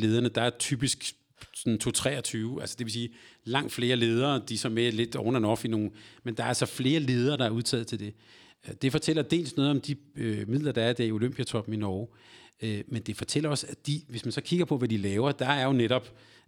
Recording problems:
abrupt cut into speech; at the start

